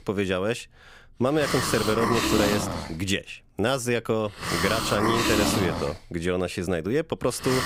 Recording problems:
hiss; loud; throughout; as loud as the speech

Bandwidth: 15.5 kHz